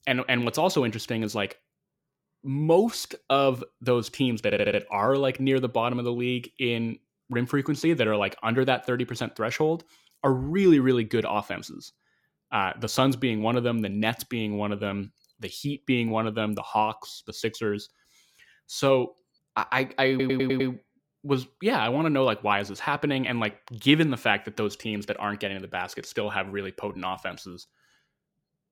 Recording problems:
audio stuttering; at 4.5 s and at 20 s

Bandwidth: 17 kHz